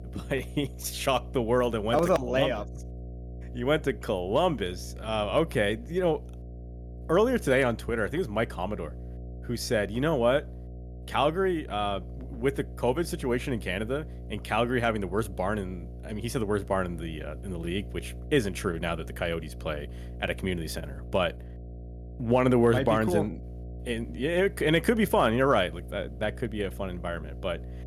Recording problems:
electrical hum; faint; throughout; 60 Hz, 25 dB below the speech

